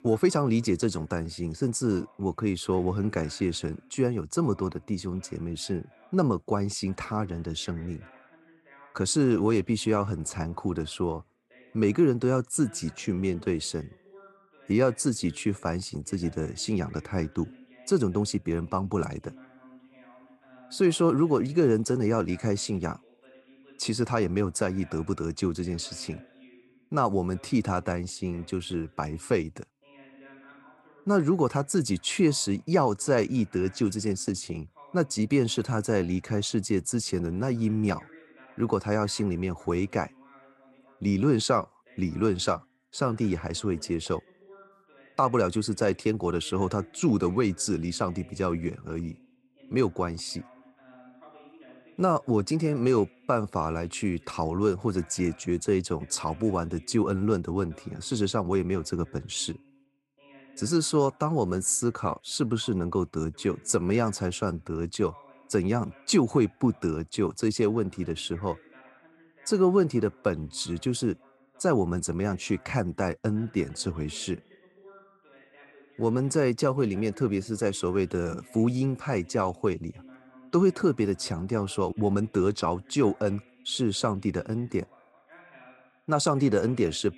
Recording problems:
voice in the background; faint; throughout; 25 dB below the speech

